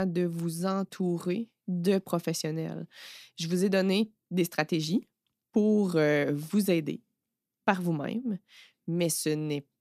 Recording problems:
abrupt cut into speech; at the start

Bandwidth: 14.5 kHz